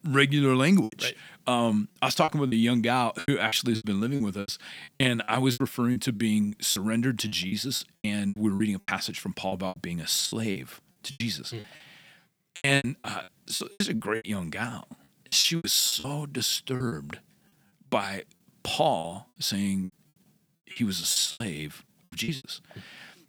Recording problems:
choppy; very; 15% of the speech affected

